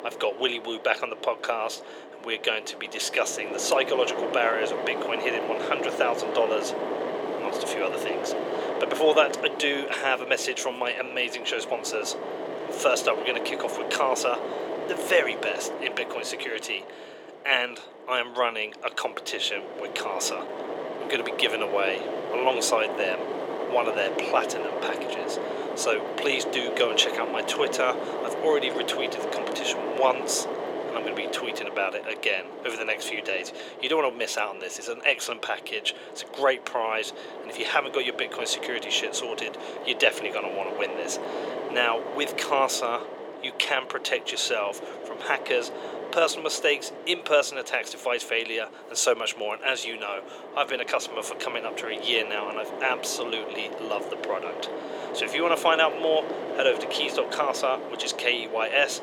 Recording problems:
thin; very; fading below 450 Hz
wind noise on the microphone; heavy; 7 dB below the speech

